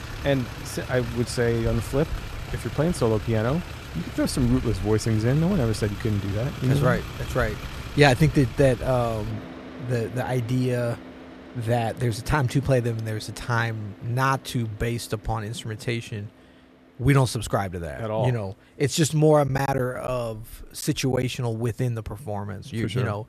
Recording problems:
traffic noise; noticeable; throughout; 10 dB below the speech
choppy; very; from 19 to 21 s; 5% of the speech affected

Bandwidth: 14.5 kHz